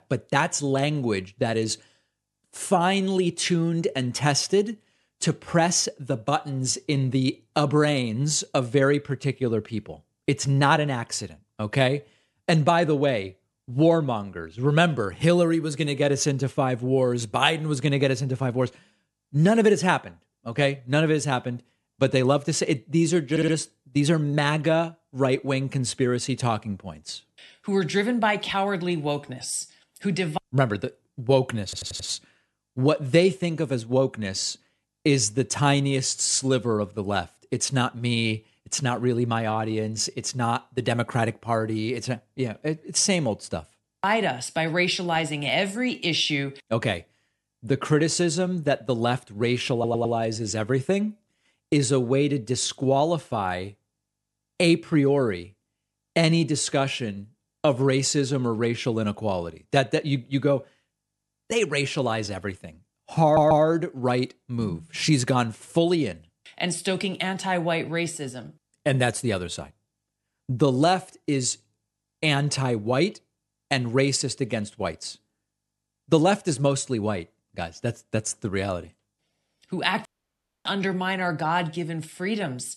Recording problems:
audio stuttering; 4 times, first at 23 s
audio cutting out; at 1:20 for 0.5 s

